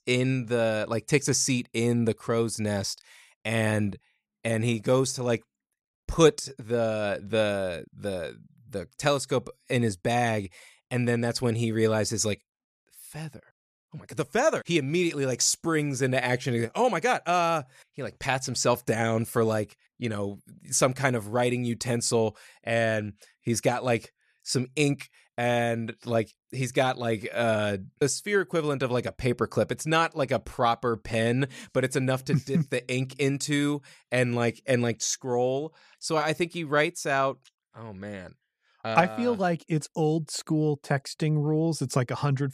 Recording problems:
none

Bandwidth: 14.5 kHz